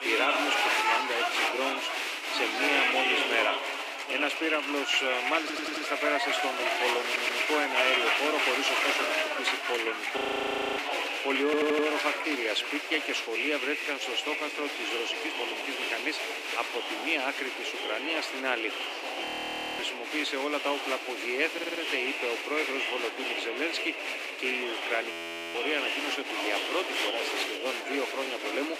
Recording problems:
thin; very slightly; fading below 300 Hz
crowd noise; very loud; throughout; 1 dB above the speech
voice in the background; loud; throughout; 4 dB below the speech
audio stuttering; 4 times, first at 5.5 s
audio freezing; at 10 s for 0.5 s, at 19 s for 0.5 s and at 25 s

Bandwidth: 15 kHz